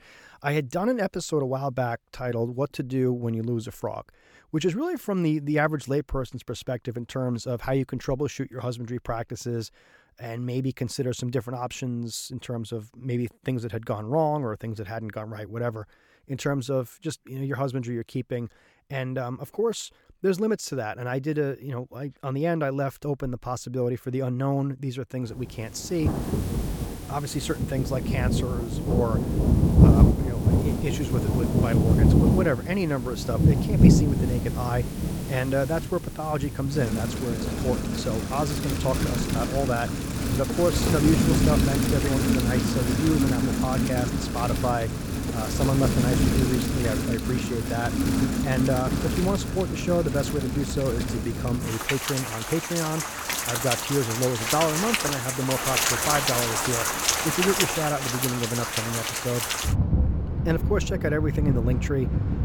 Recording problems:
rain or running water; very loud; from 26 s on; 4 dB above the speech

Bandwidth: 18.5 kHz